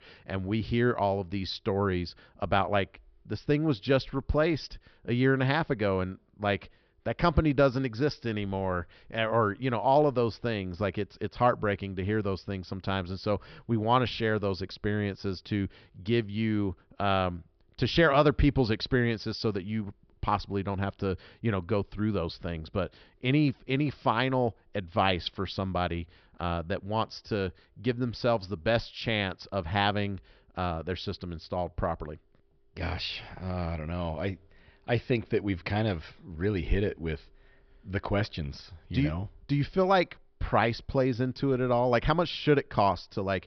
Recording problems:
high frequencies cut off; noticeable; nothing above 5.5 kHz

